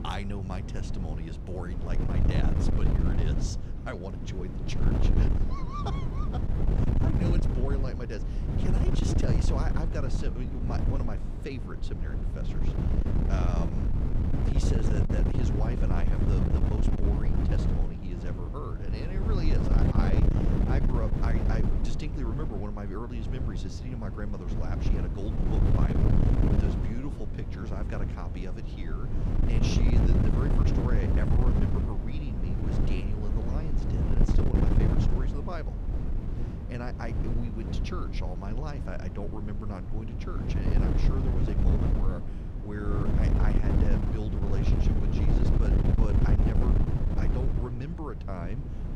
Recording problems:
wind noise on the microphone; heavy; 2 dB above the speech

